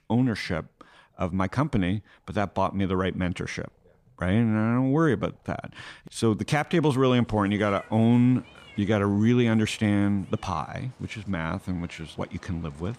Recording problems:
animal sounds; faint; throughout; 25 dB below the speech

